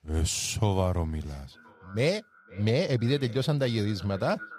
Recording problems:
echo of what is said; faint; from 1.5 s on; 510 ms later, 25 dB below the speech

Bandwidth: 15 kHz